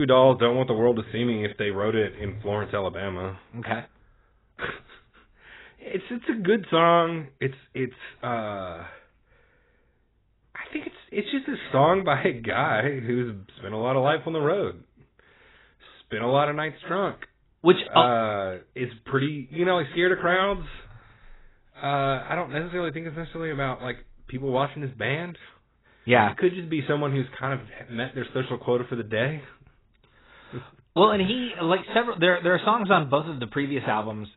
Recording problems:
garbled, watery; badly; nothing above 4 kHz
abrupt cut into speech; at the start

